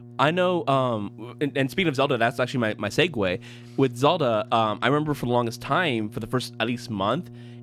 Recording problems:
electrical hum; faint; throughout; 60 Hz, 25 dB below the speech

